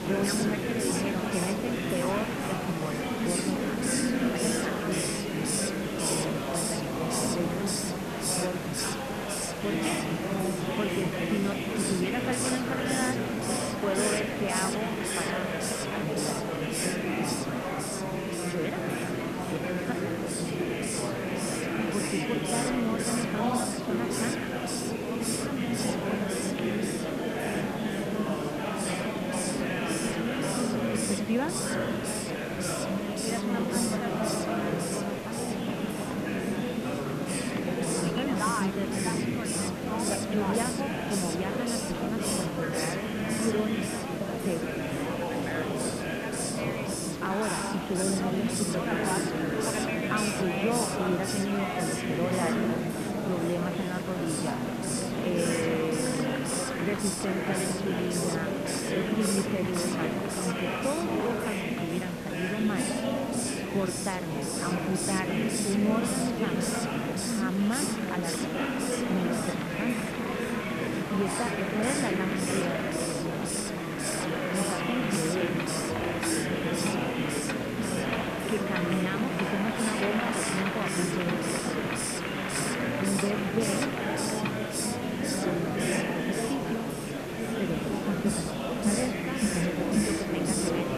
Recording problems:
muffled; very; fading above 3 kHz
murmuring crowd; very loud; throughout; 3 dB above the speech
hiss; loud; throughout; 2 dB below the speech
household noises; noticeable; throughout; 15 dB below the speech

